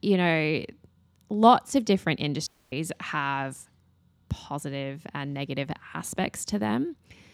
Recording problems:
audio cutting out; at 2.5 s

